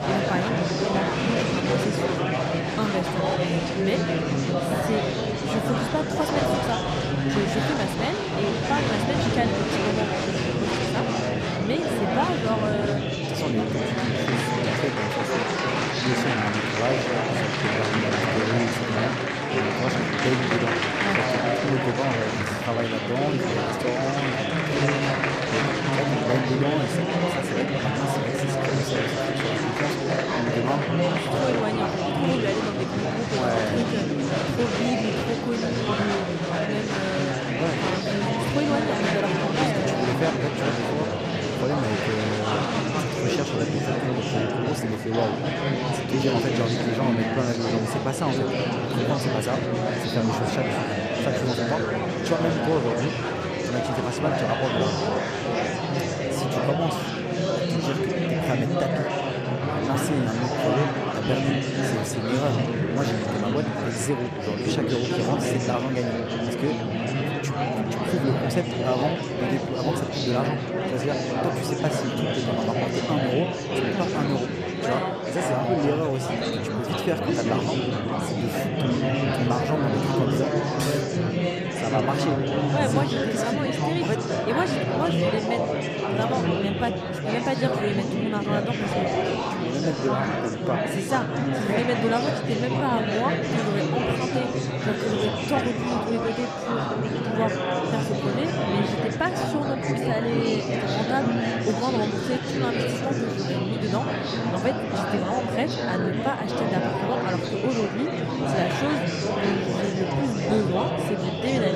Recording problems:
murmuring crowd; very loud; throughout; 4 dB above the speech
abrupt cut into speech; at the end

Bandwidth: 14.5 kHz